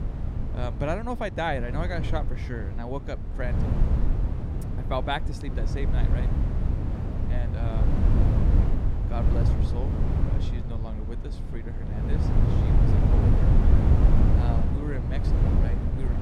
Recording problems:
wind noise on the microphone; heavy; 2 dB below the speech

